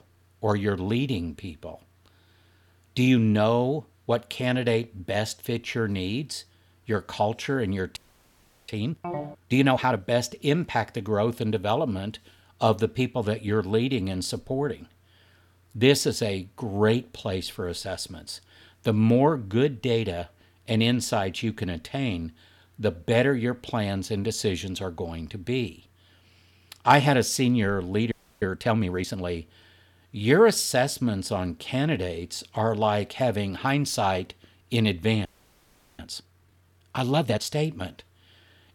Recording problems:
audio freezing; at 8 s for 0.5 s, at 28 s and at 35 s for 0.5 s
phone ringing; noticeable; at 9 s; peak 8 dB below the speech

